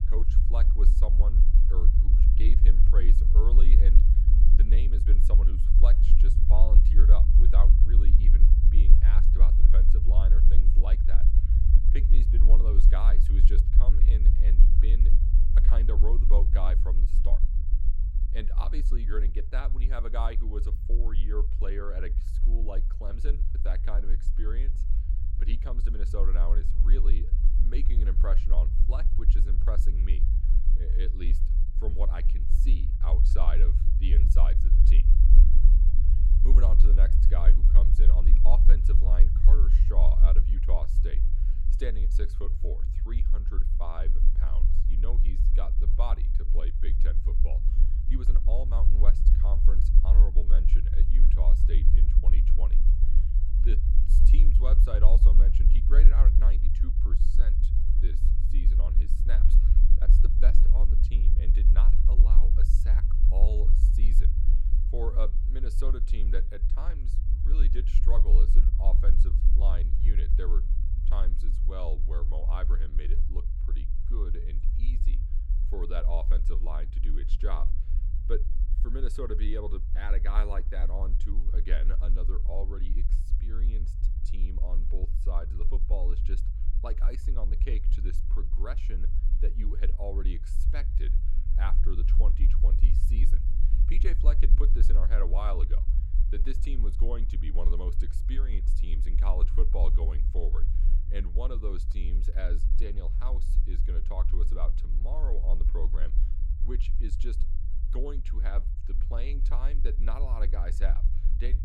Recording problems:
low rumble; loud; throughout; 5 dB below the speech

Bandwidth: 16 kHz